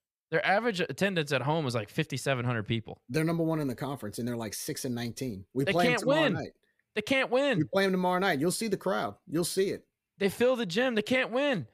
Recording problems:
none

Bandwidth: 15.5 kHz